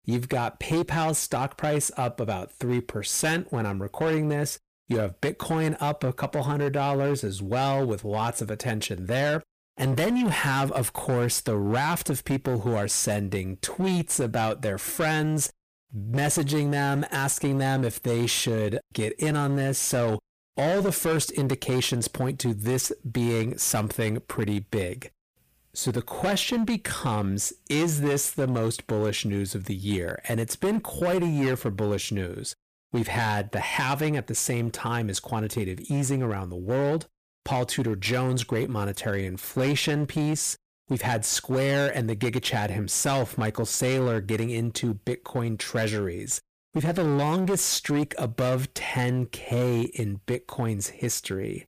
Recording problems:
distortion; slight; 14% of the sound clipped

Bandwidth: 15 kHz